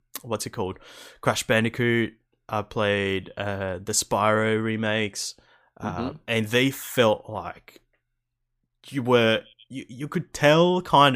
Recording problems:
abrupt cut into speech; at the end

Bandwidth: 15 kHz